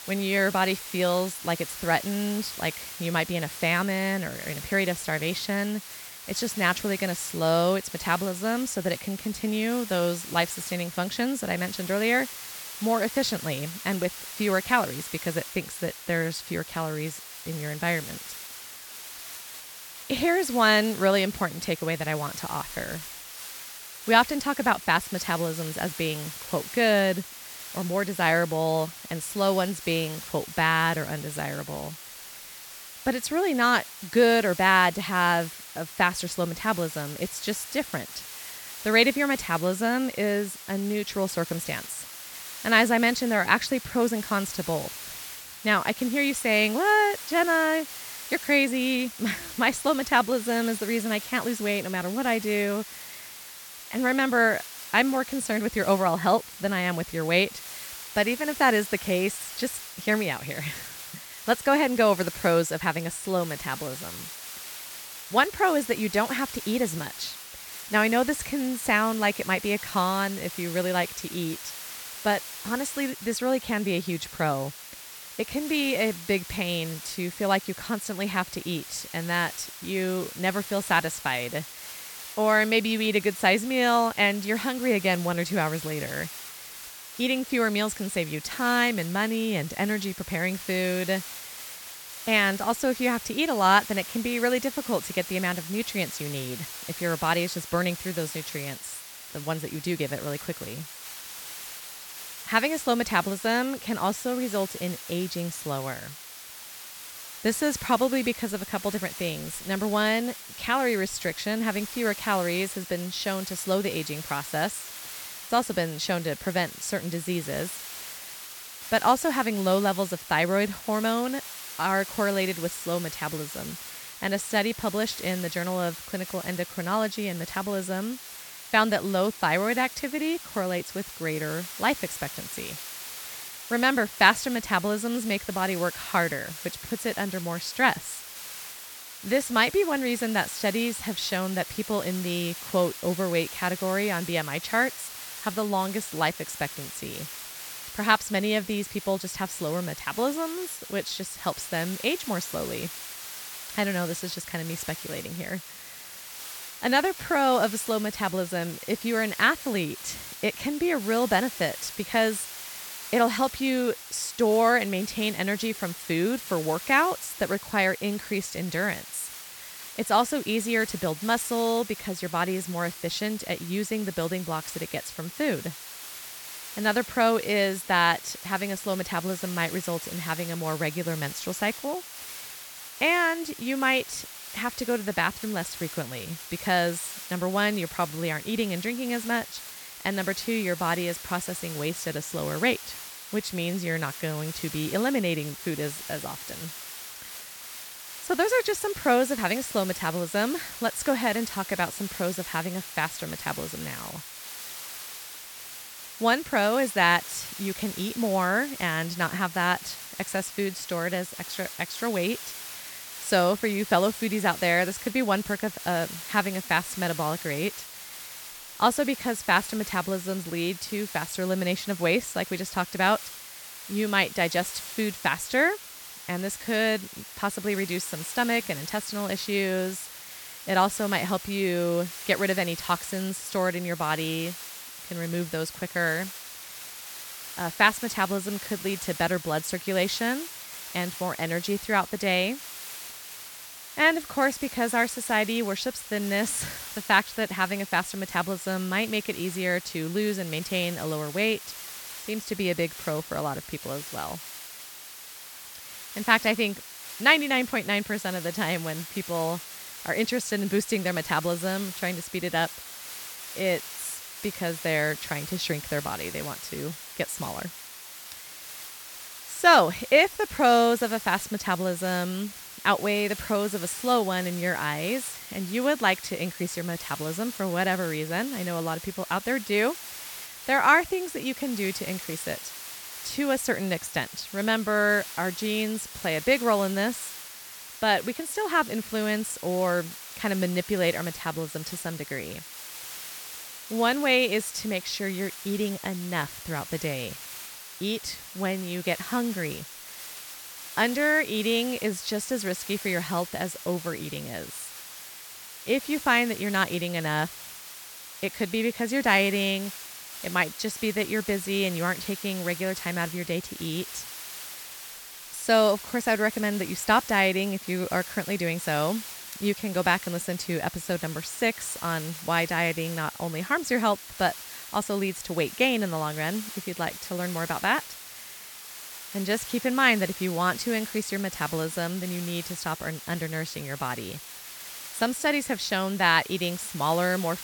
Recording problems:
hiss; noticeable; throughout; 10 dB below the speech

